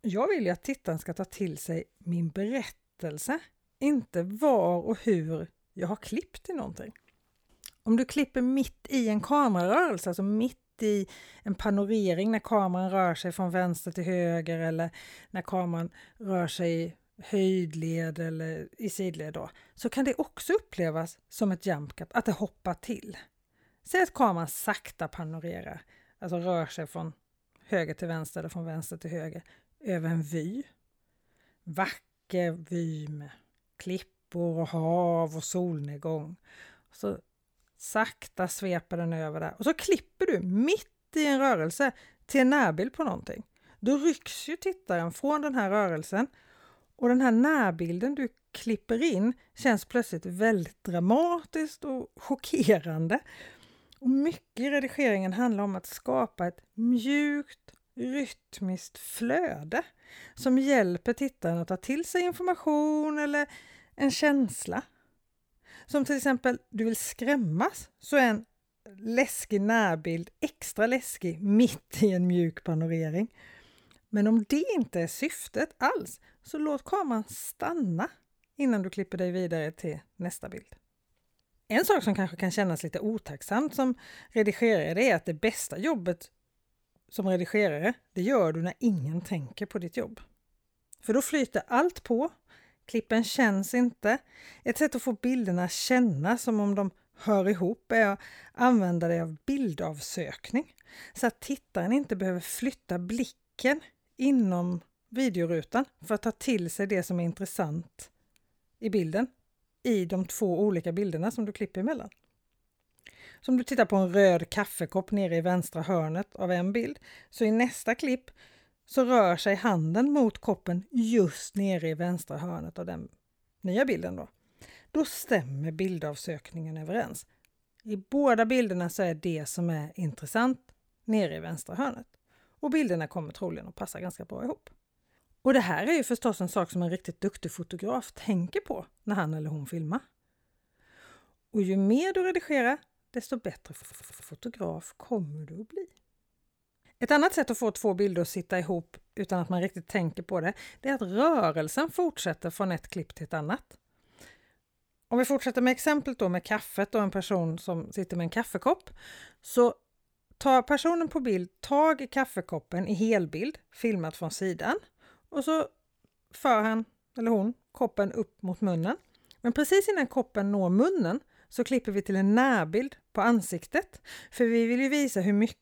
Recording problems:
audio stuttering; at 2:24

